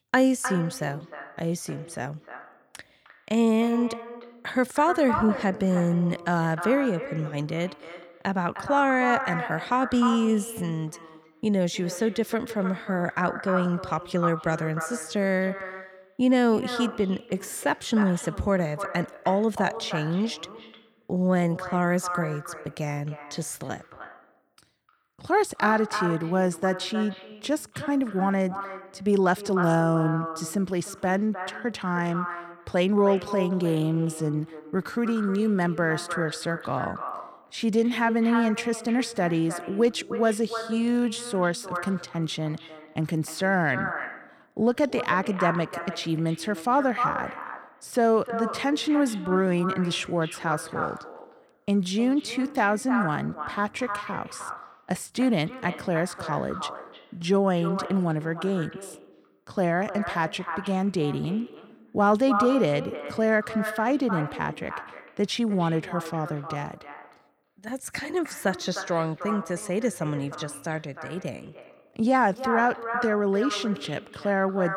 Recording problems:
echo of what is said; strong; throughout; 310 ms later, 9 dB below the speech

